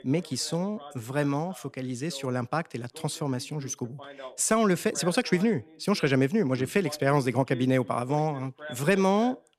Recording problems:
voice in the background; noticeable; throughout; 20 dB below the speech

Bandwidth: 14.5 kHz